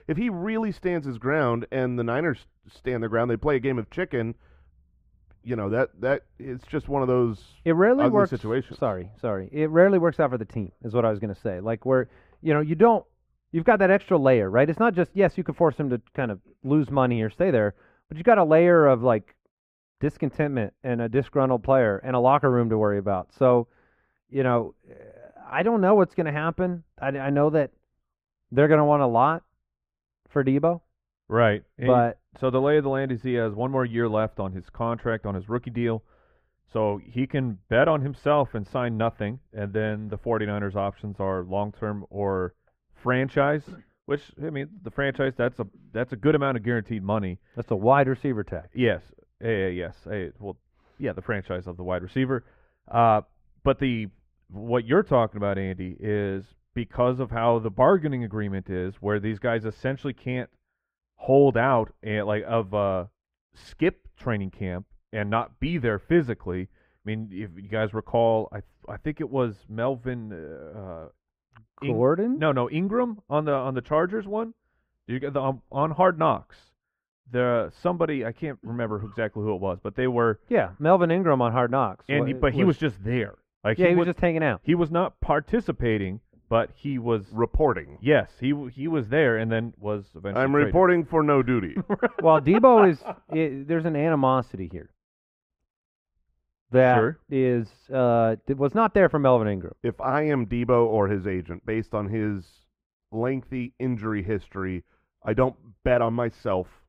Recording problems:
muffled; very; fading above 3 kHz

